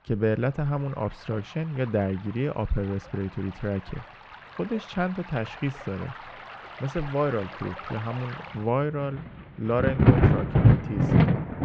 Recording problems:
muffled; very; fading above 3.5 kHz
rain or running water; very loud; throughout; 7 dB above the speech

